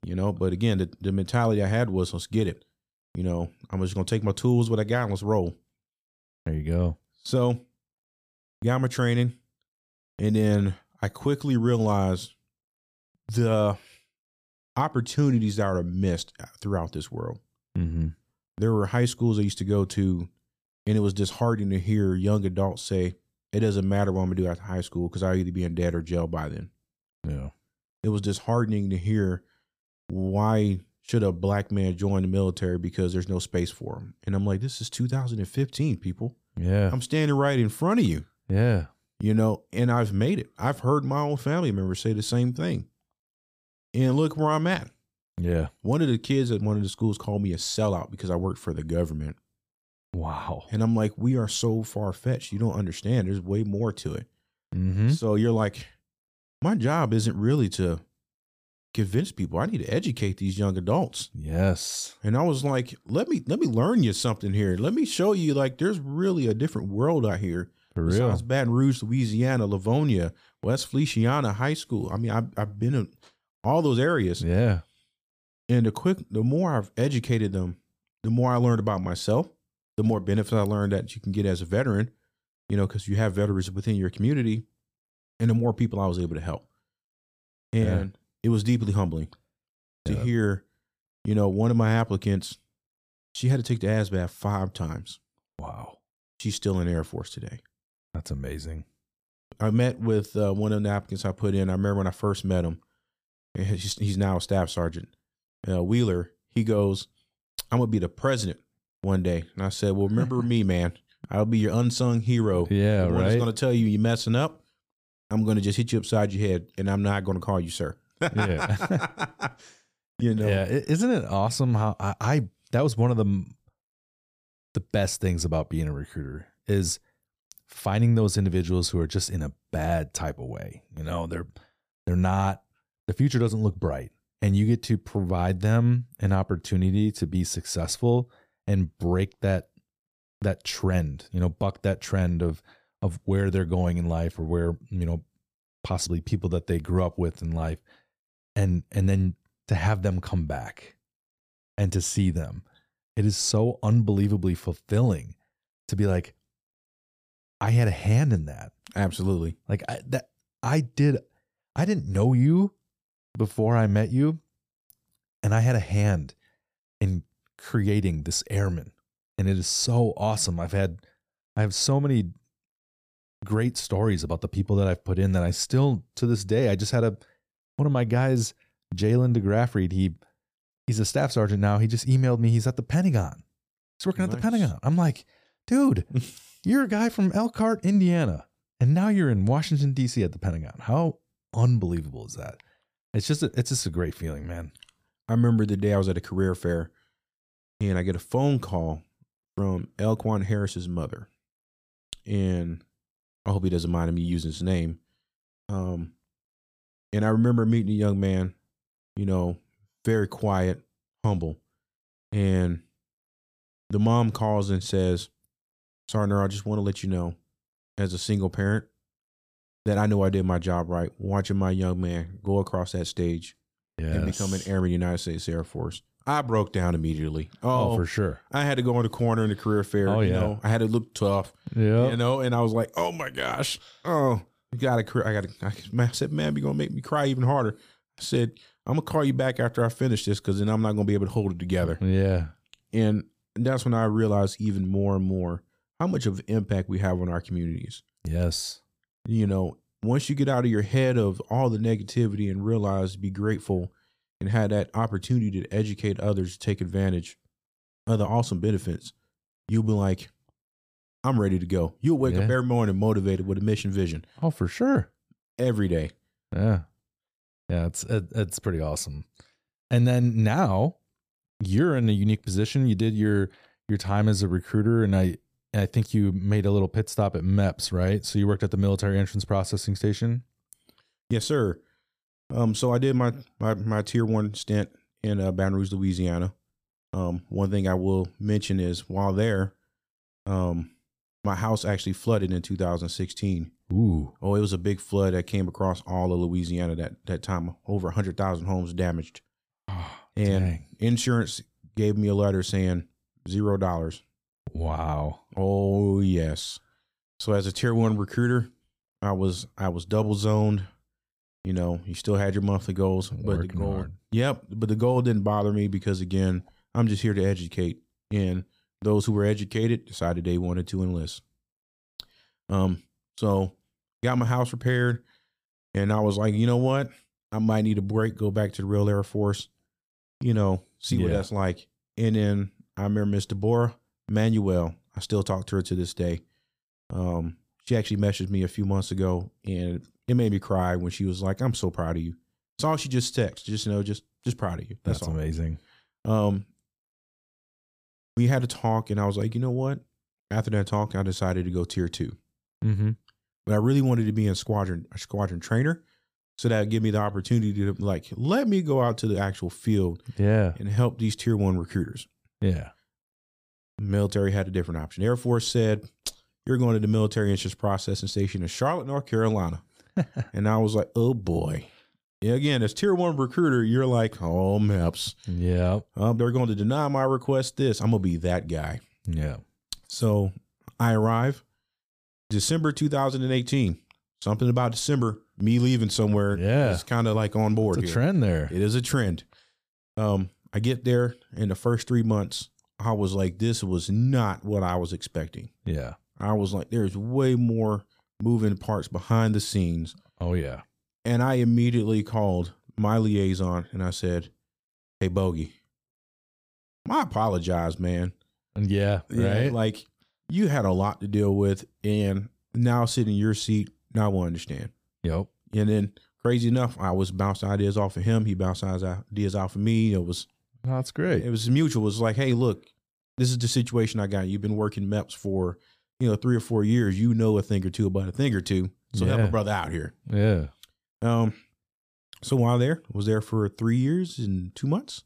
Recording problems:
none

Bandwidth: 15 kHz